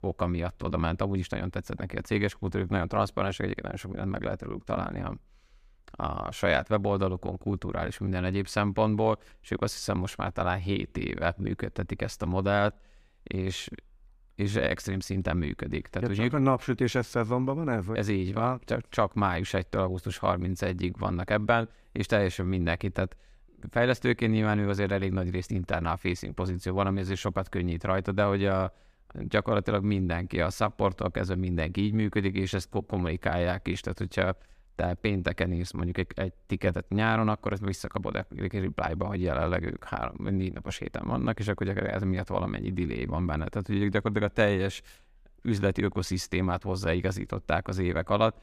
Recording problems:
none

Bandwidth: 15 kHz